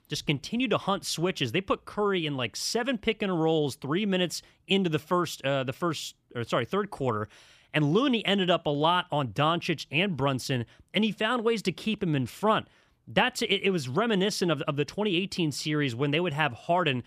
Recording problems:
none

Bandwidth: 14.5 kHz